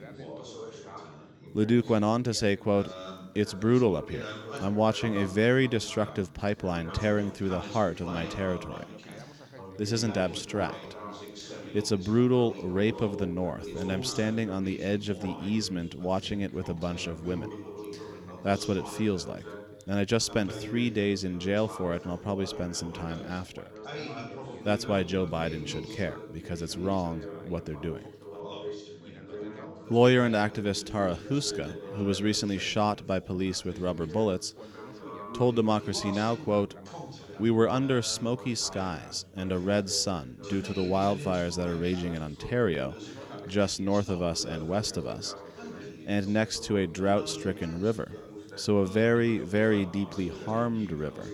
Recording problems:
background chatter; noticeable; throughout; 3 voices, 15 dB below the speech

